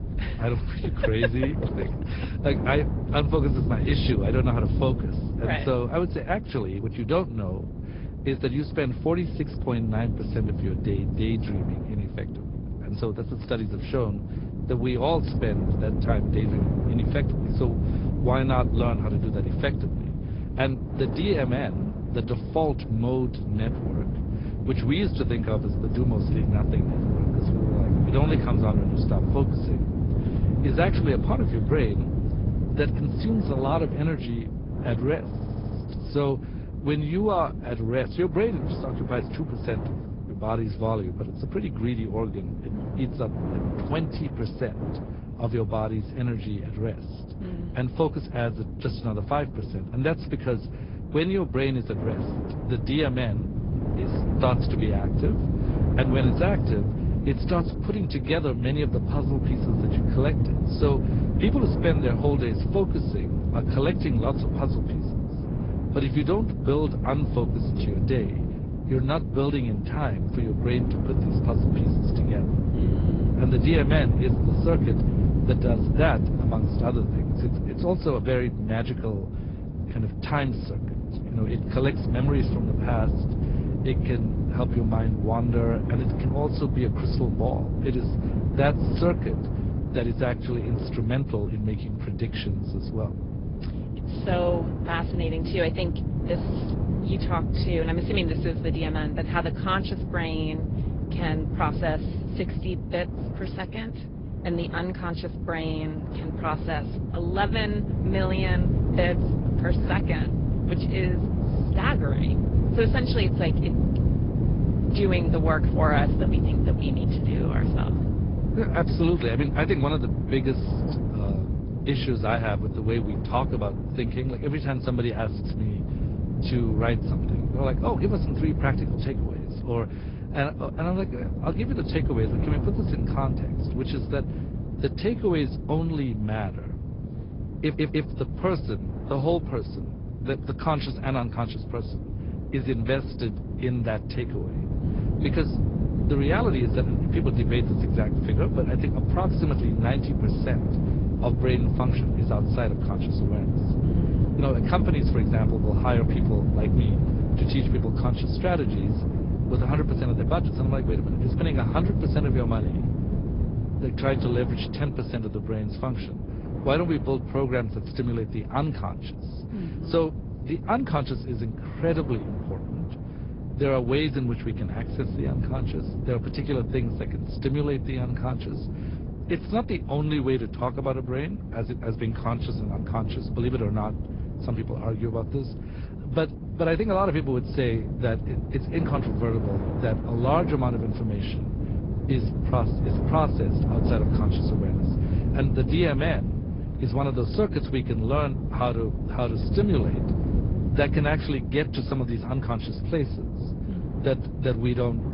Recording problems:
high frequencies cut off; noticeable; nothing above 5 kHz
garbled, watery; slightly
low rumble; loud; throughout; 7 dB below the speech
wind noise on the microphone; occasional gusts; 15 dB below the speech
audio stuttering; at 35 s and at 2:18

